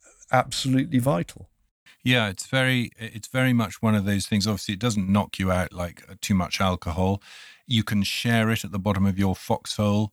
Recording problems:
none

